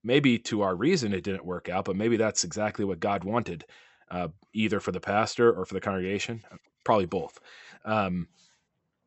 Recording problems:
high frequencies cut off; noticeable; nothing above 8 kHz

